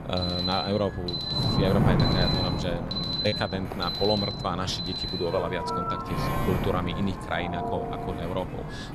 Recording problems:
wind noise on the microphone; heavy; 5 dB below the speech
alarms or sirens; loud; throughout; 1 dB below the speech
choppy; occasionally; at 3.5 s; 3% of the speech affected

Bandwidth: 13.5 kHz